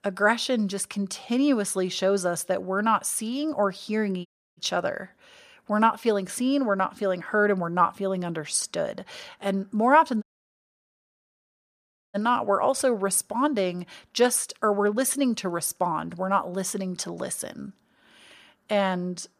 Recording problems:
audio cutting out; at 4.5 s and at 10 s for 2 s

